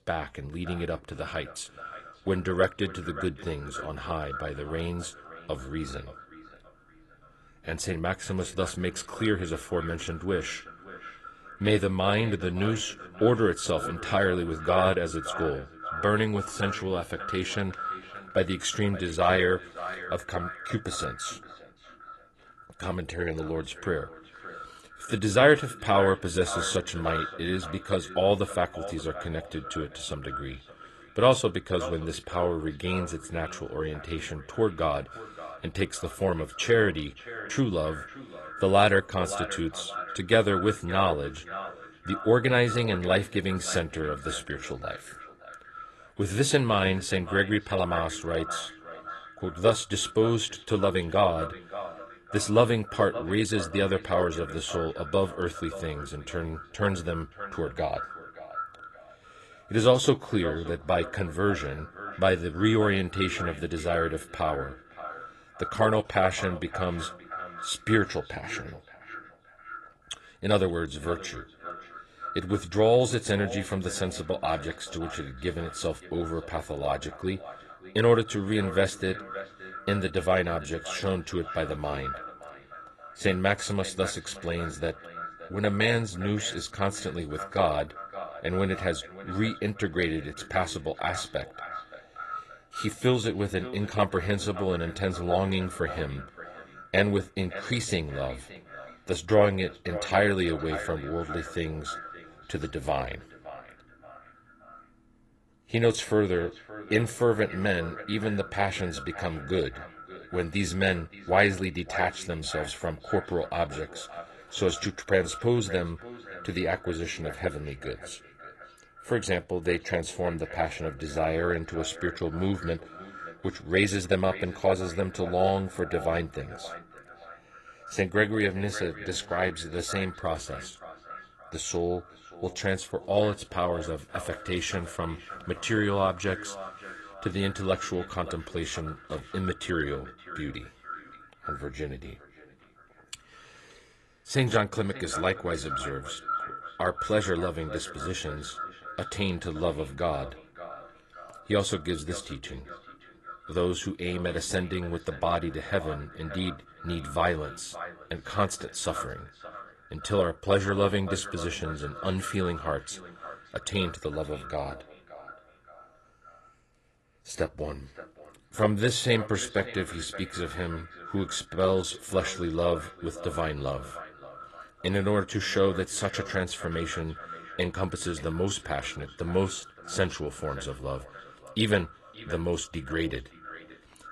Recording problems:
echo of what is said; noticeable; throughout; 570 ms later, 15 dB below the speech
garbled, watery; slightly

